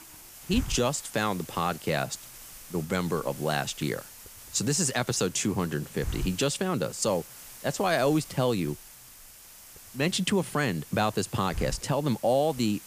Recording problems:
hiss; noticeable; throughout; 15 dB below the speech

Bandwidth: 15 kHz